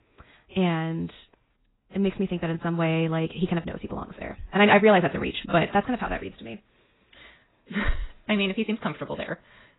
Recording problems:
garbled, watery; badly; nothing above 4 kHz
wrong speed, natural pitch; too fast; 1.5 times normal speed

